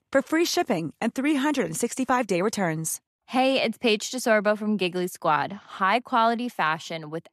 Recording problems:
none

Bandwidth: 13.5 kHz